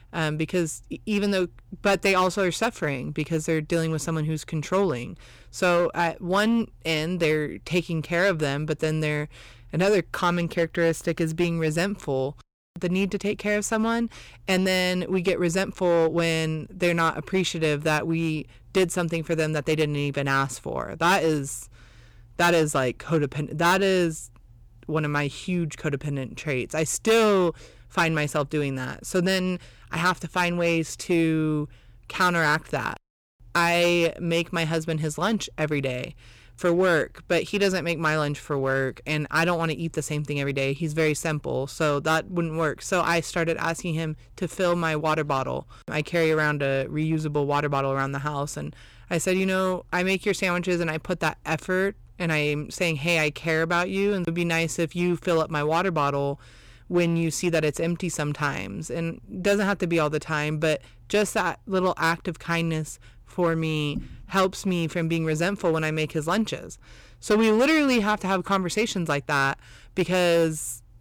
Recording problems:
distortion; slight; 5% of the sound clipped

